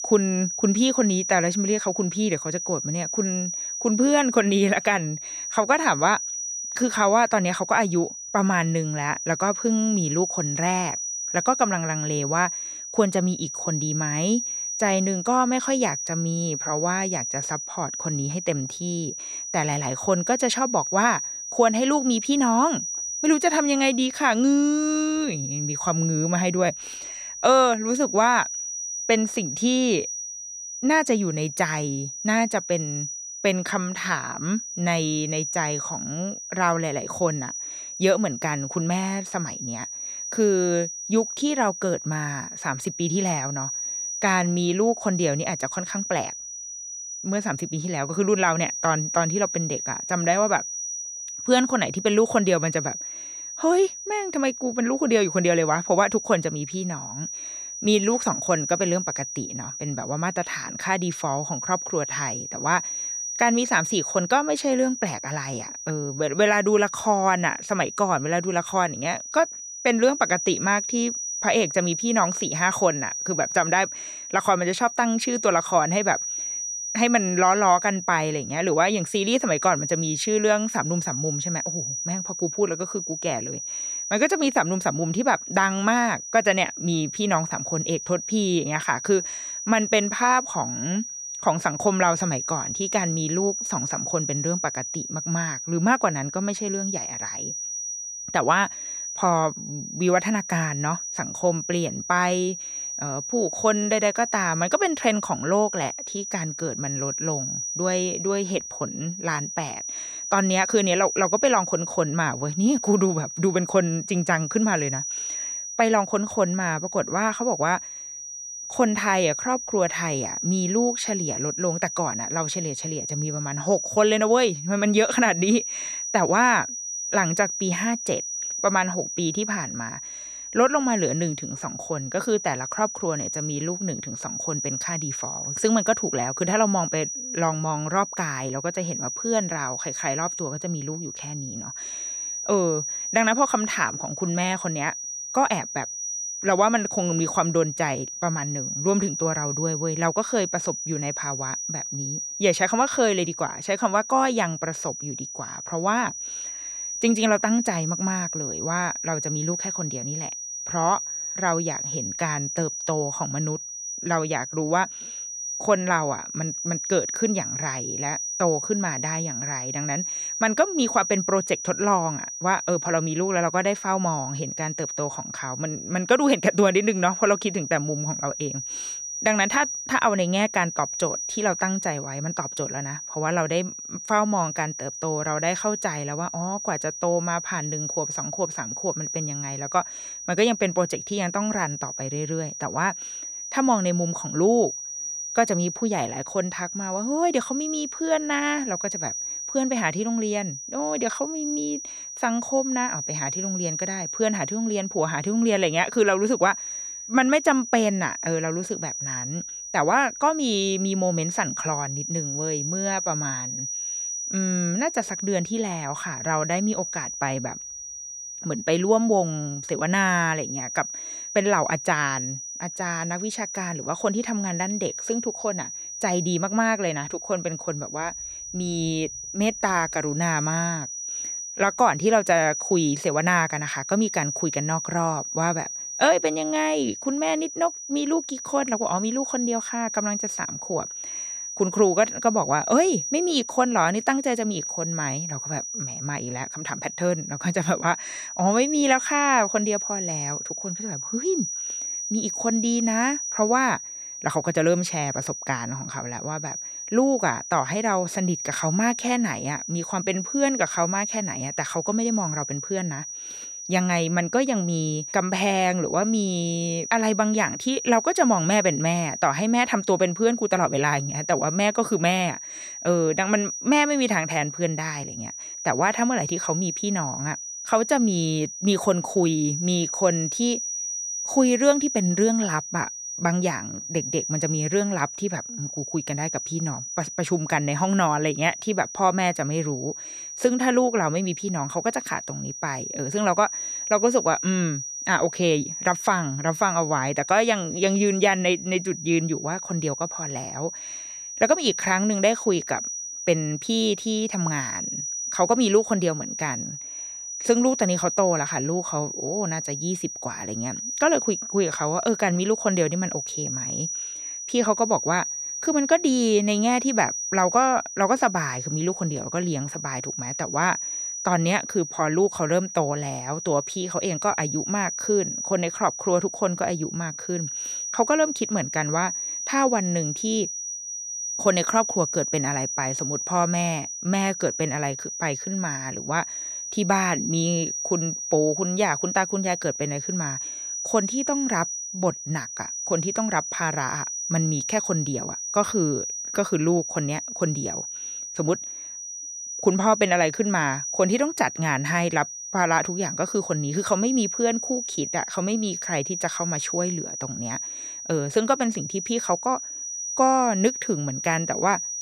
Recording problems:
high-pitched whine; loud; throughout; 6 kHz, 5 dB below the speech

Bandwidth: 14.5 kHz